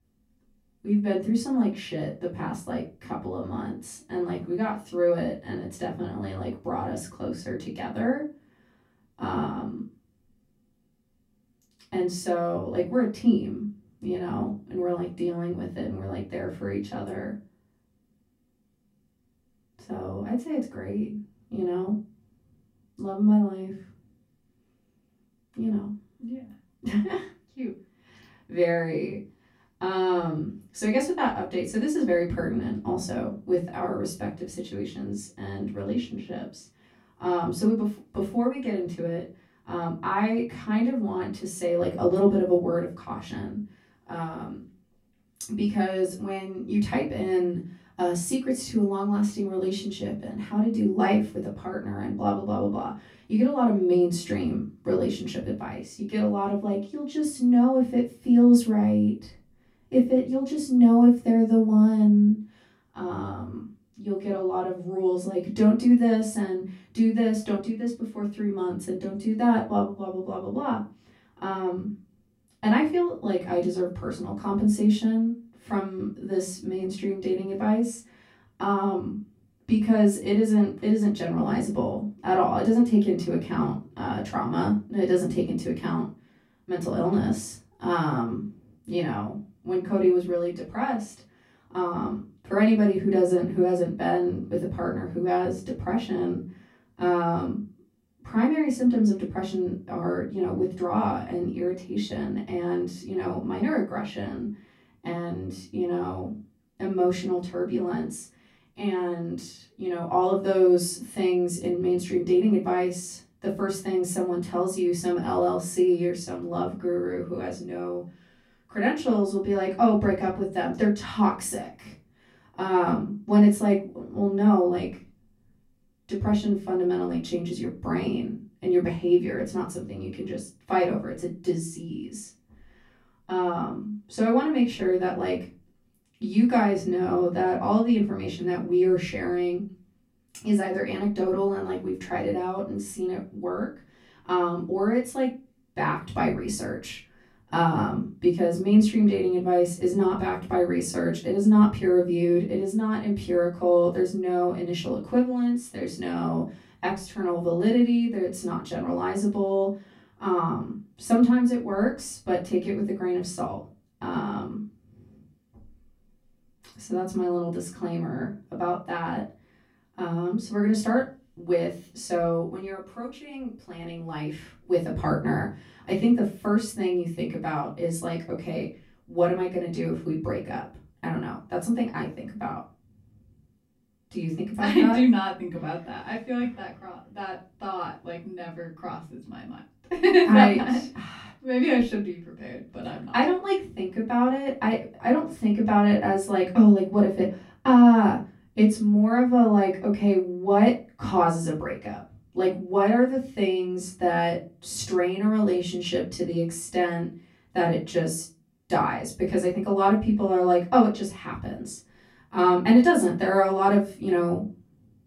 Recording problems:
off-mic speech; far
room echo; slight; dies away in 0.3 s

